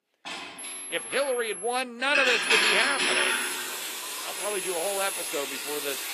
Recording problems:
thin; somewhat; fading below 350 Hz
garbled, watery; slightly; nothing above 14.5 kHz
household noises; very loud; throughout; 3 dB above the speech
high-pitched whine; loud; from 0.5 to 2 s, from 2.5 to 3.5 s and at 4.5 s; 11 kHz, 7 dB below the speech

